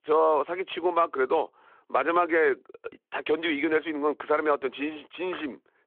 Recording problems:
phone-call audio

